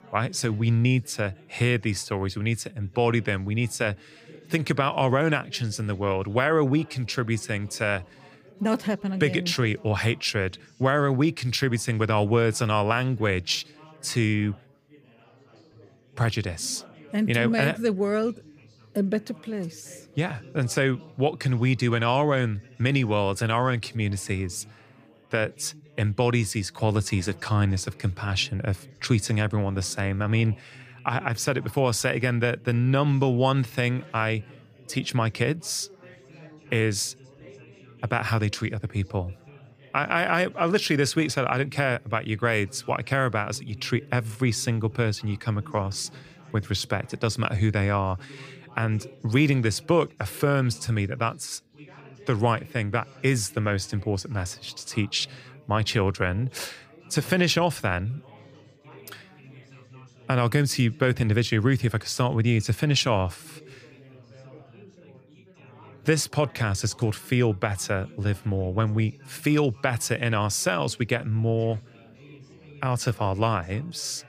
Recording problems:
background chatter; faint; throughout; 4 voices, 25 dB below the speech

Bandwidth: 15 kHz